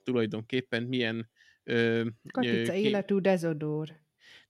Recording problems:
none

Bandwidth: 16 kHz